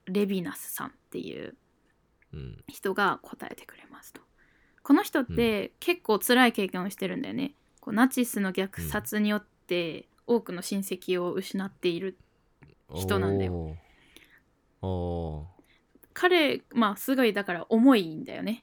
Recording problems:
none

